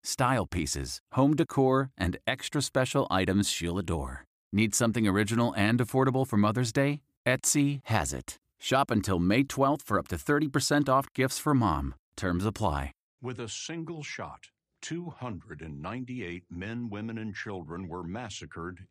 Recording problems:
none

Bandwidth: 15 kHz